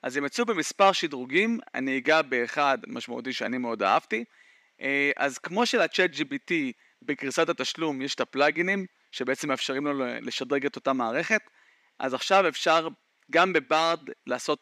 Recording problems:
thin; very slightly; fading below 250 Hz

